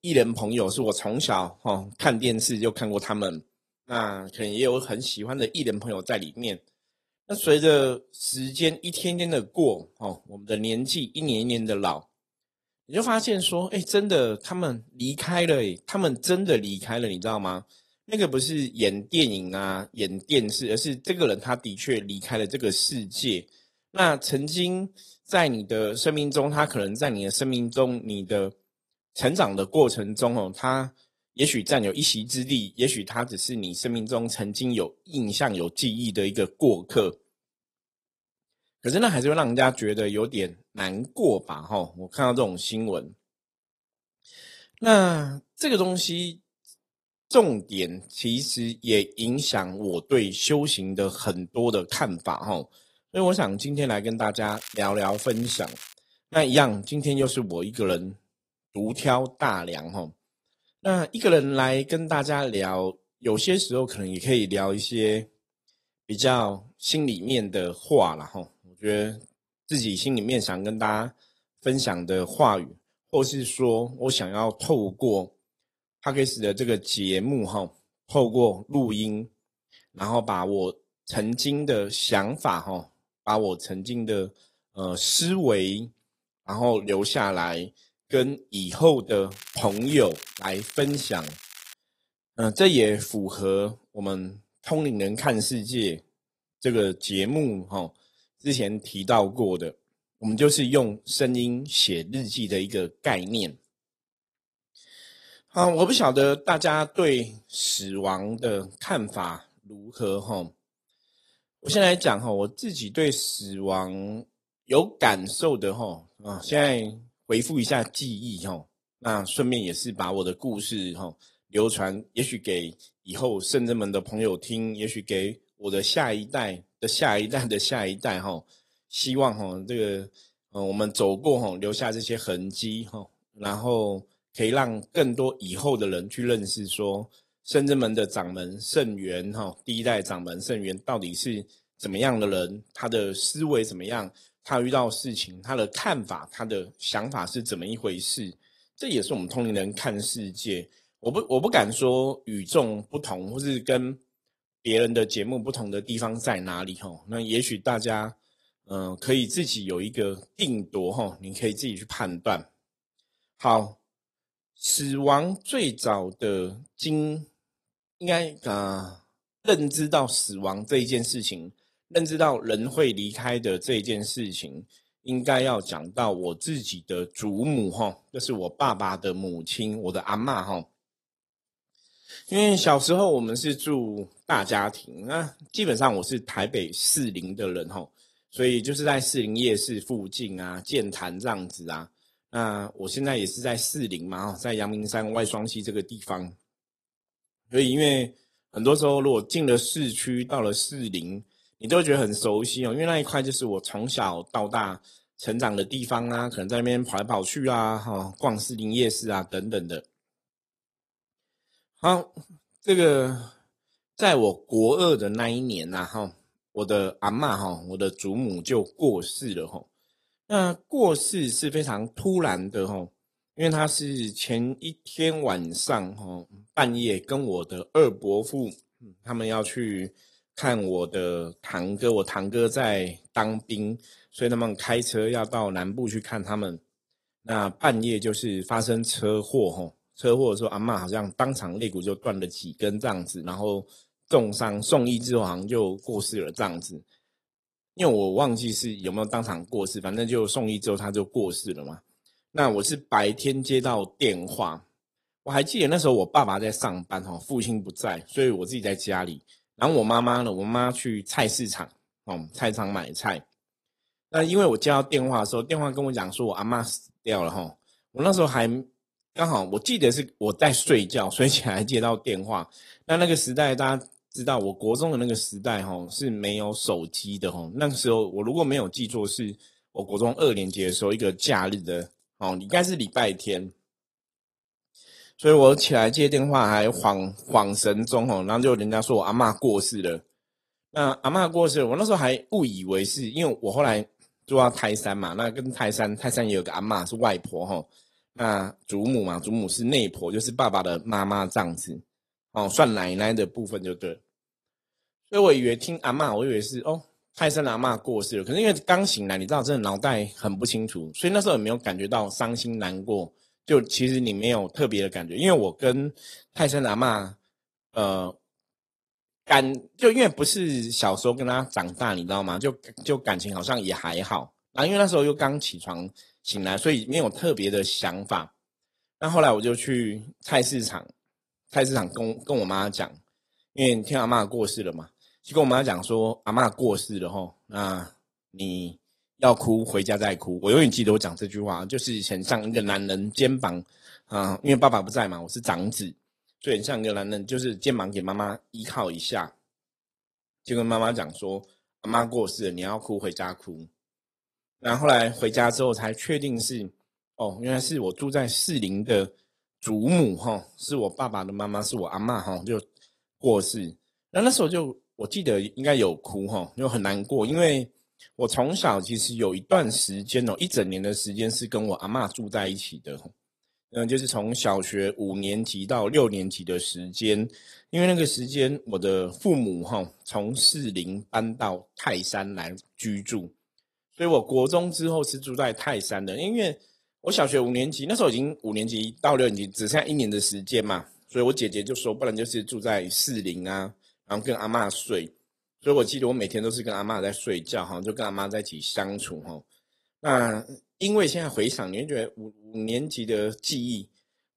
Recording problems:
garbled, watery; slightly
crackling; noticeable; from 54 to 56 s and from 1:29 to 1:32; 15 dB below the speech

